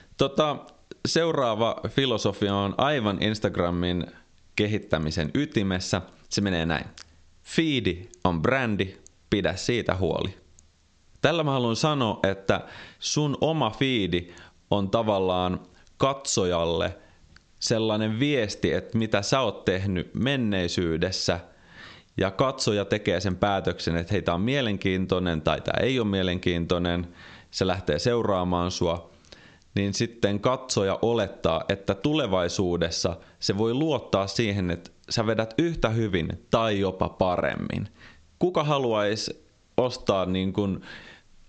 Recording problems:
squashed, flat; heavily
high frequencies cut off; noticeable; nothing above 8 kHz

